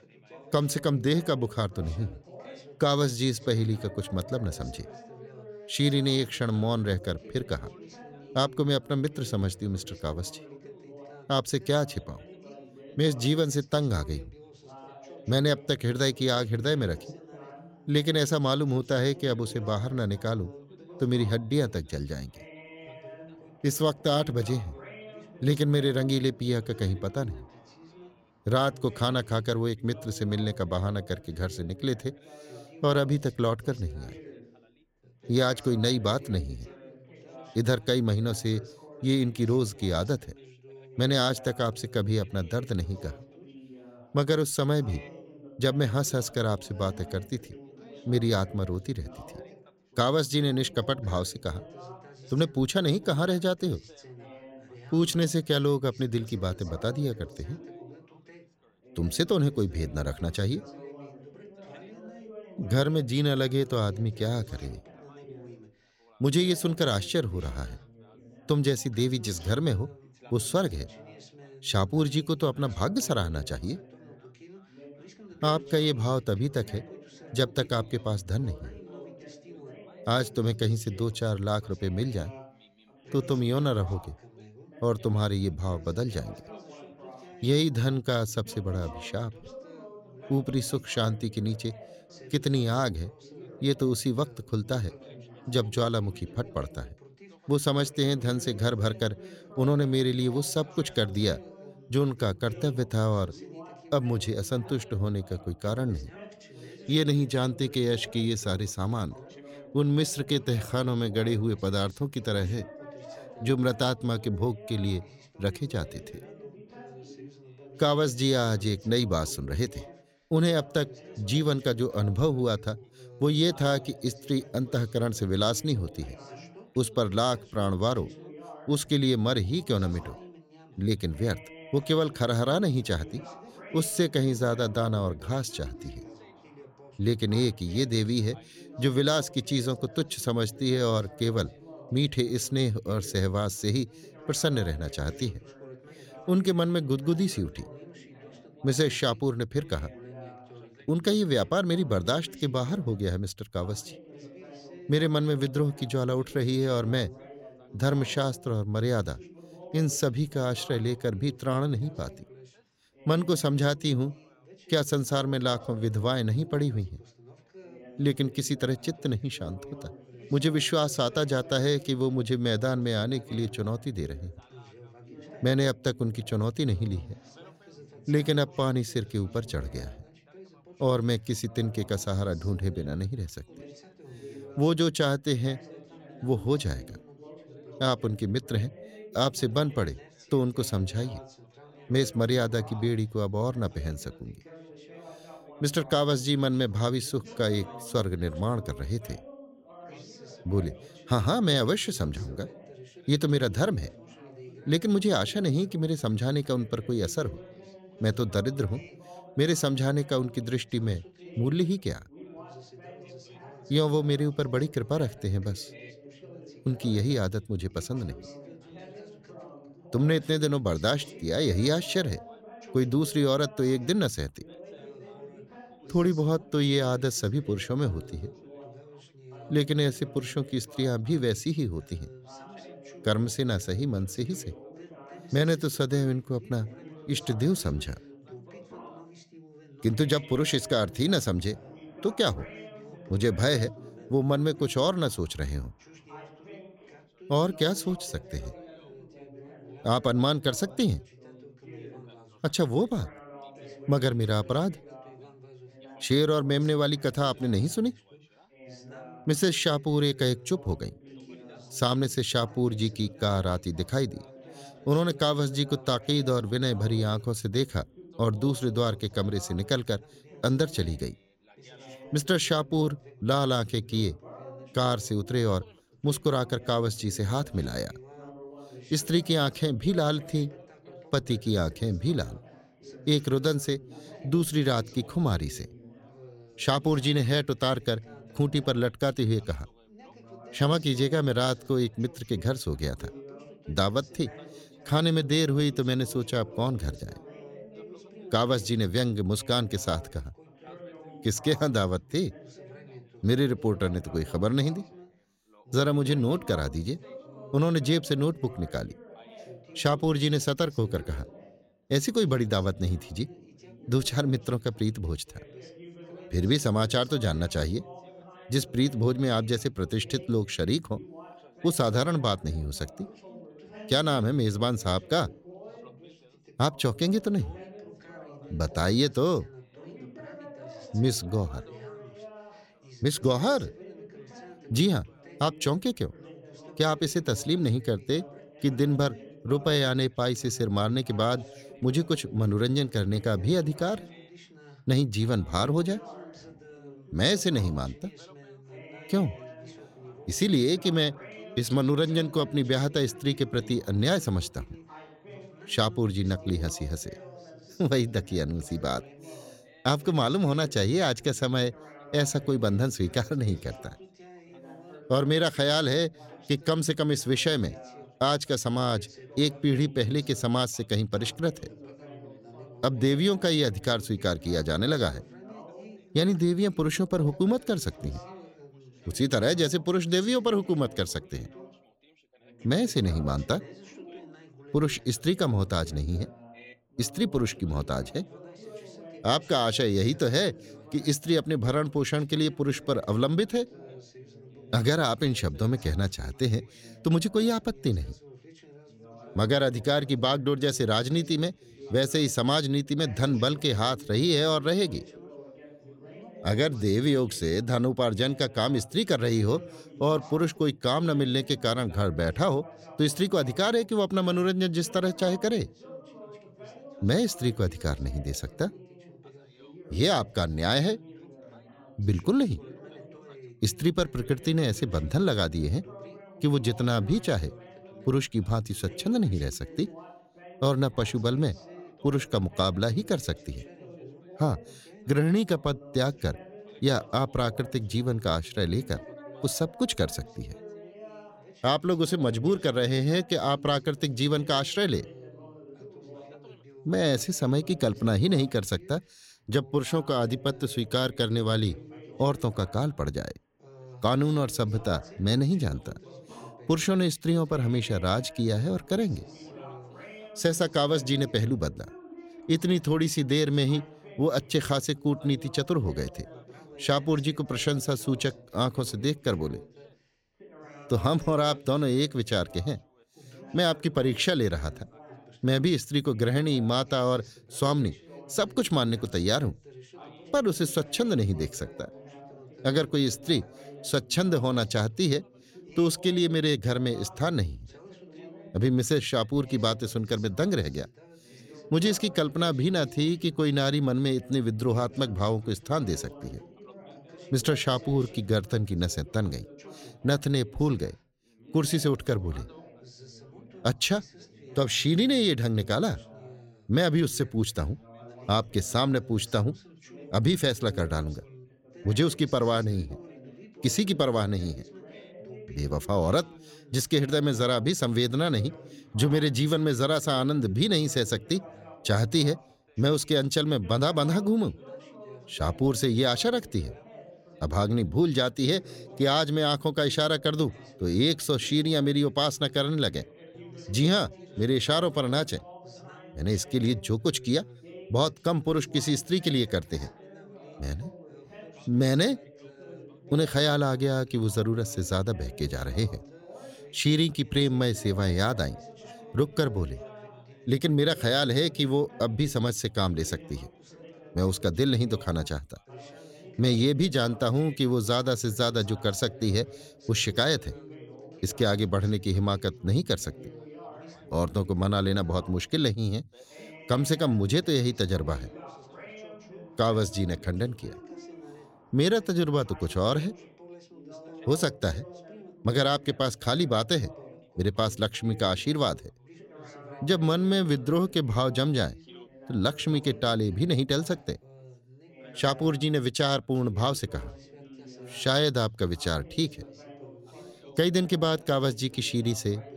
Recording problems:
background chatter; faint; throughout; 3 voices, 20 dB below the speech

